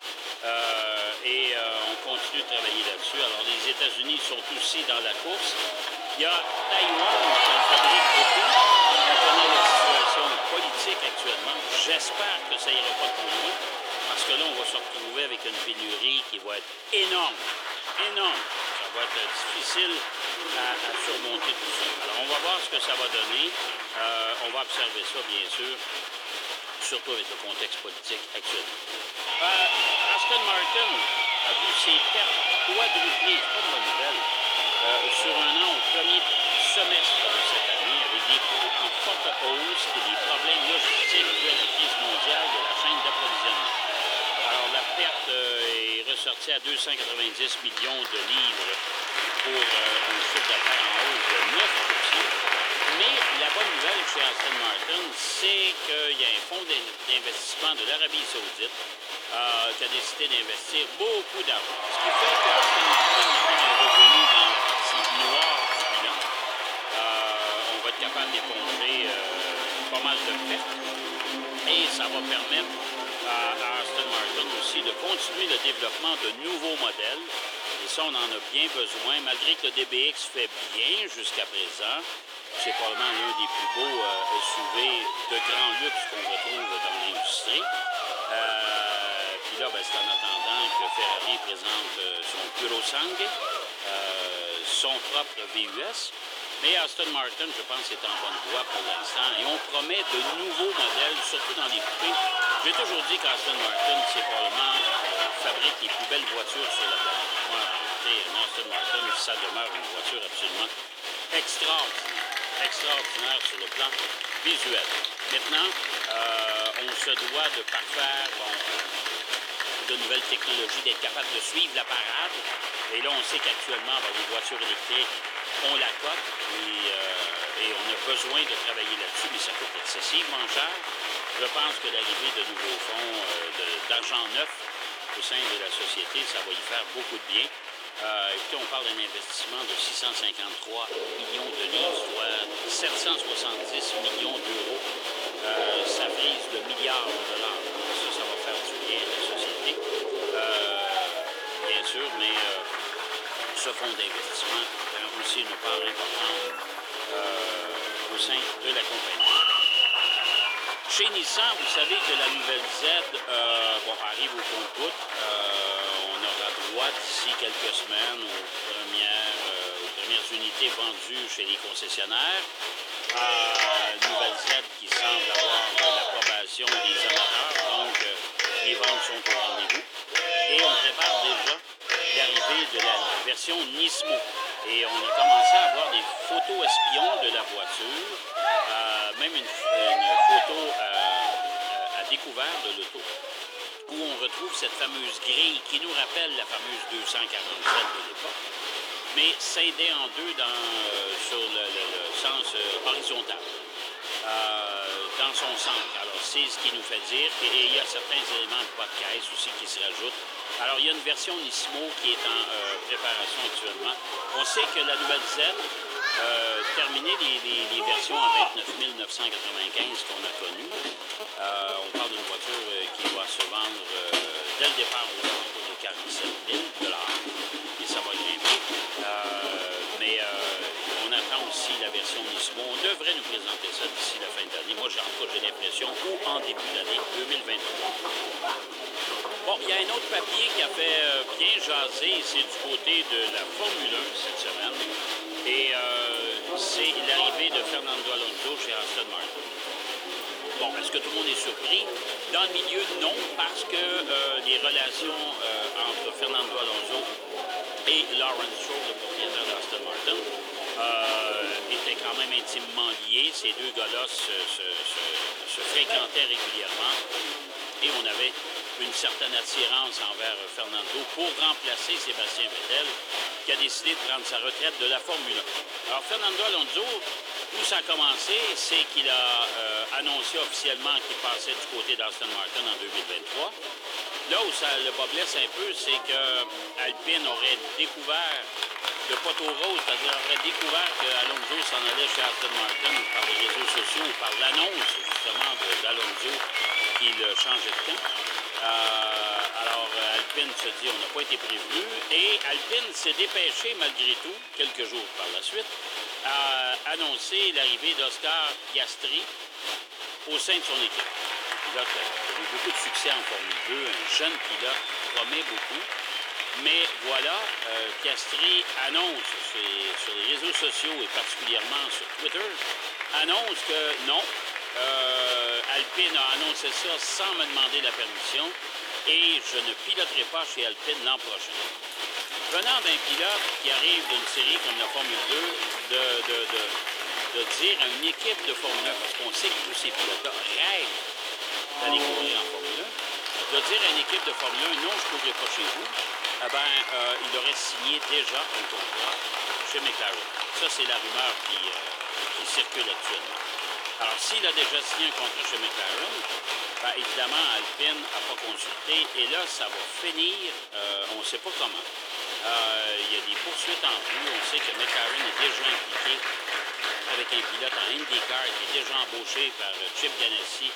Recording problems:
thin; very; fading below 350 Hz
crowd noise; loud; throughout; 1 dB below the speech

